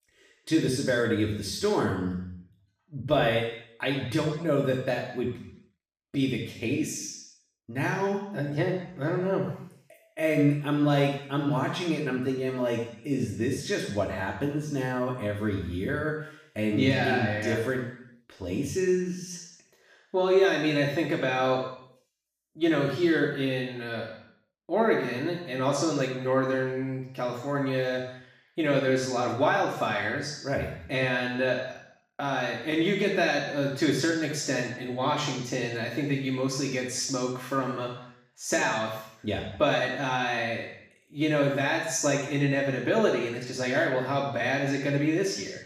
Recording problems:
off-mic speech; far
room echo; noticeable; dies away in 0.7 s

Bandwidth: 15 kHz